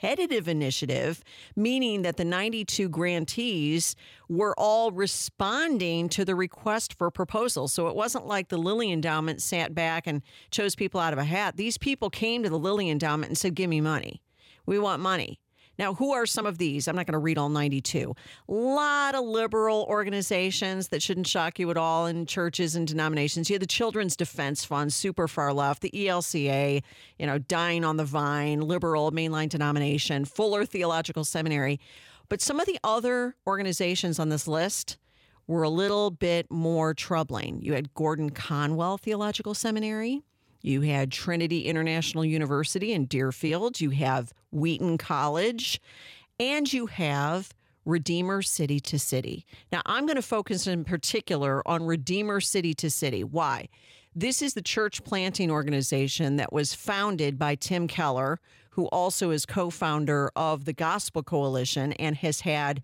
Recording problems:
uneven, jittery; slightly; from 1.5 to 55 s

